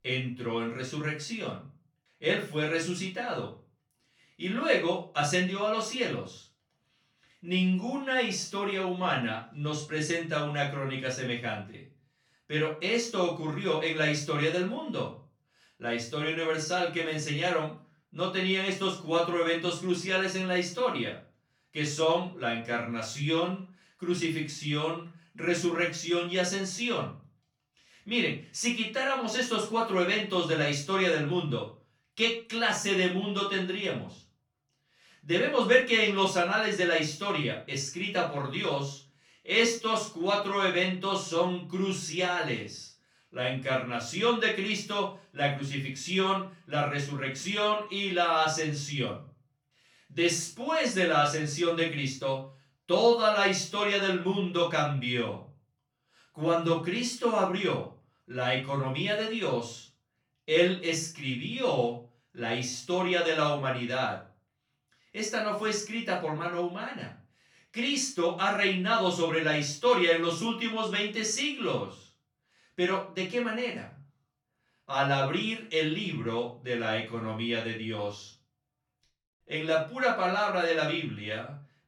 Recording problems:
off-mic speech; far
room echo; slight; dies away in 0.3 s

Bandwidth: 18.5 kHz